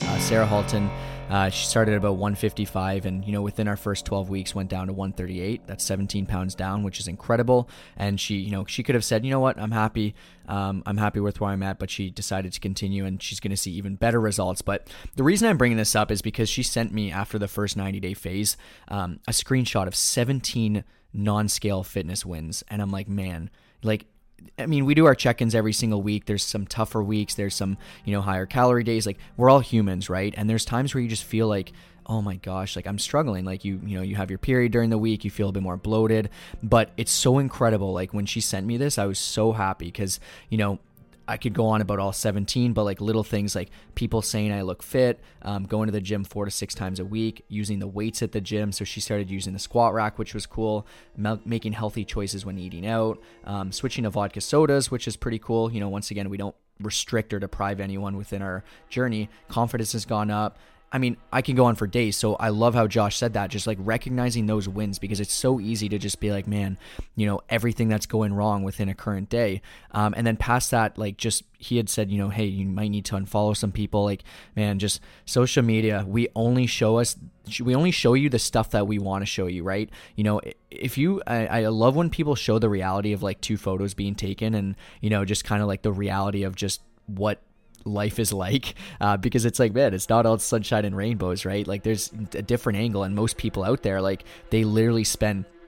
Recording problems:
background music; faint; throughout; 20 dB below the speech

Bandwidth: 16.5 kHz